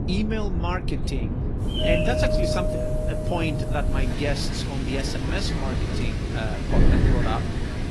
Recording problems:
garbled, watery; slightly; nothing above 11.5 kHz
wind noise on the microphone; heavy; 5 dB below the speech
animal sounds; loud; throughout; 5 dB below the speech
doorbell; loud; from 1.5 to 4 s; peak 6 dB above the speech

